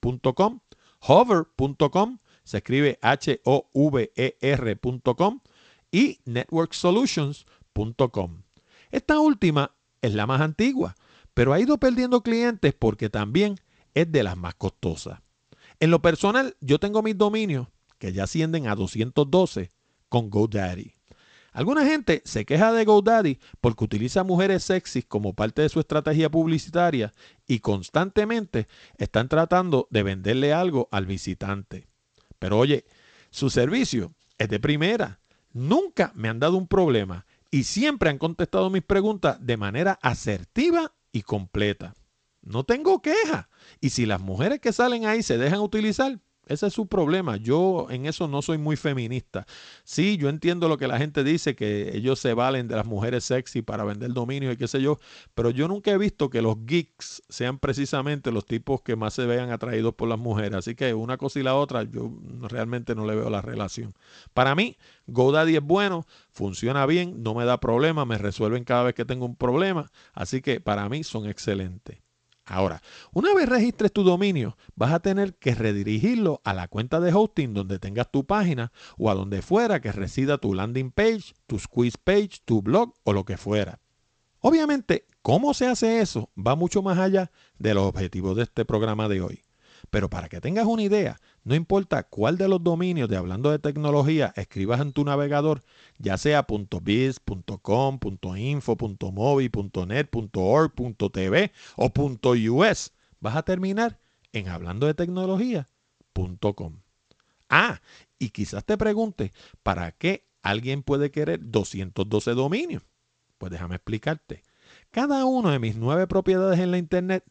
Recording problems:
garbled, watery; slightly; nothing above 8 kHz

